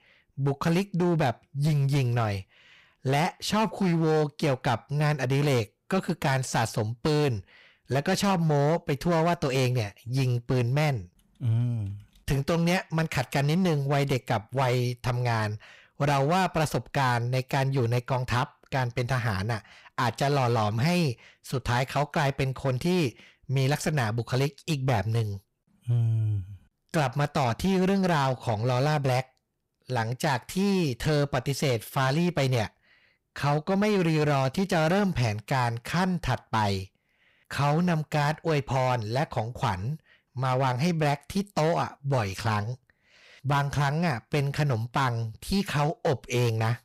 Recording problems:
distortion; slight; 11% of the sound clipped

